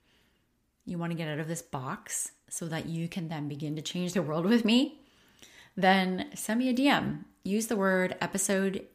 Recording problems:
none

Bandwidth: 15 kHz